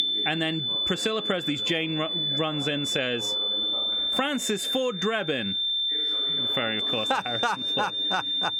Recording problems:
squashed, flat; heavily
high-pitched whine; loud; throughout; 3.5 kHz, 3 dB above the speech
voice in the background; noticeable; throughout; 15 dB below the speech

